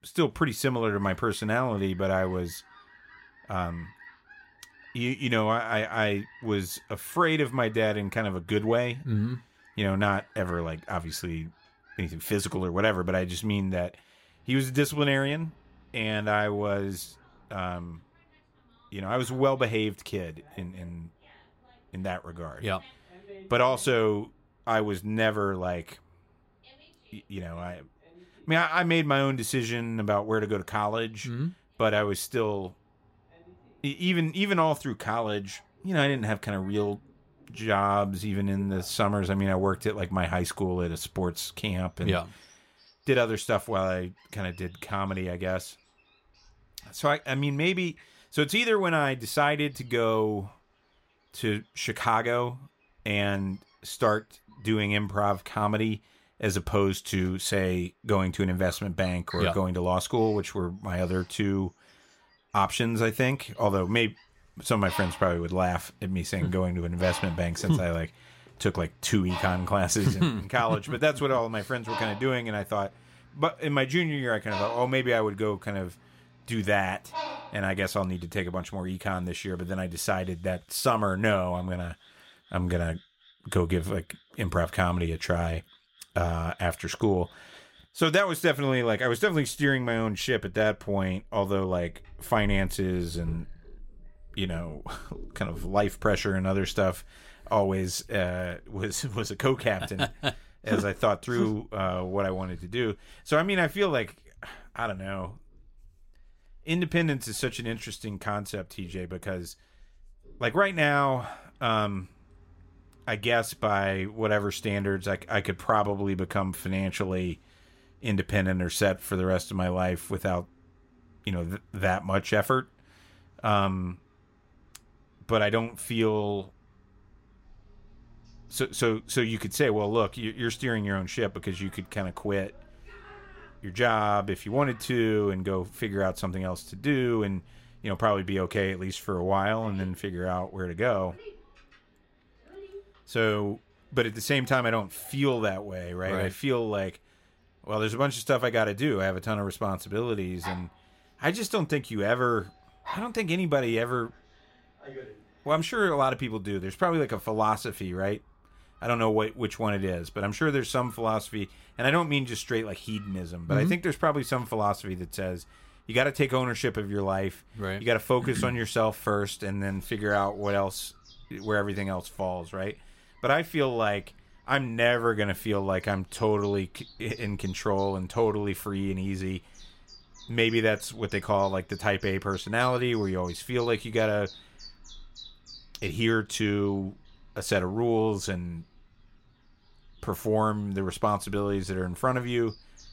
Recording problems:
animal sounds; faint; throughout; 20 dB below the speech

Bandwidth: 16 kHz